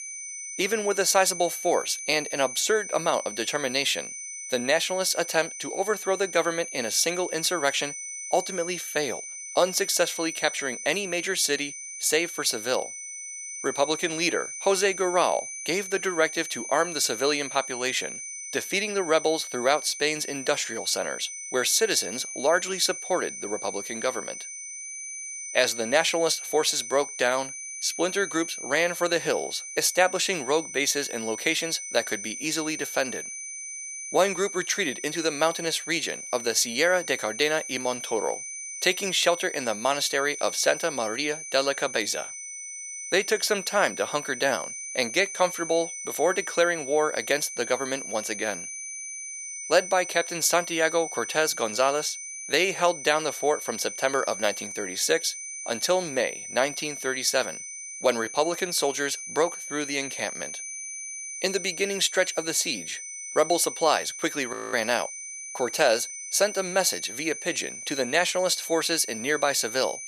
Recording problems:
thin; very; fading below 600 Hz
high-pitched whine; loud; throughout; 6 kHz, 9 dB below the speech
audio freezing; at 1:05

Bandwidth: 14.5 kHz